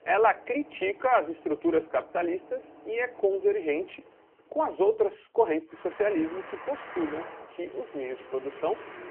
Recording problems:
phone-call audio; poor line
traffic noise; noticeable; throughout; 15 dB below the speech

